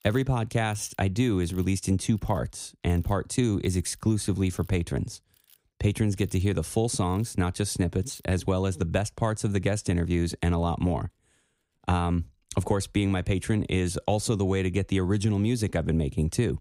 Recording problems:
machinery noise; faint; throughout; 30 dB below the speech

